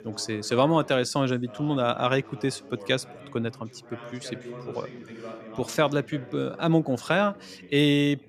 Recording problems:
background chatter; noticeable; throughout; 3 voices, 20 dB below the speech

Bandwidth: 14.5 kHz